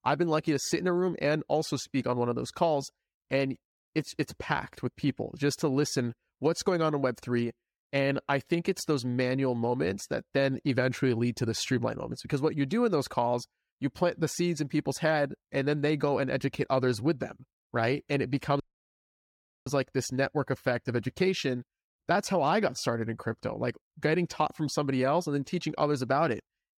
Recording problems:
audio cutting out; at 19 s for 1 s

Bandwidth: 17.5 kHz